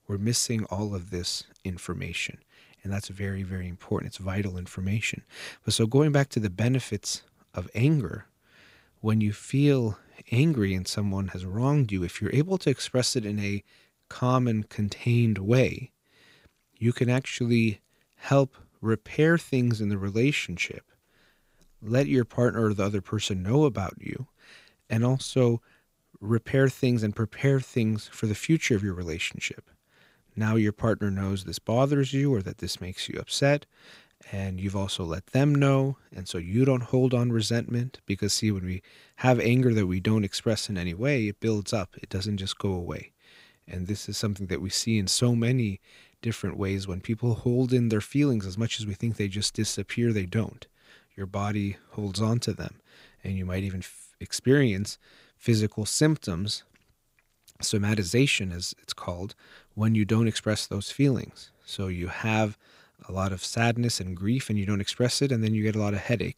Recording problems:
none

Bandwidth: 15.5 kHz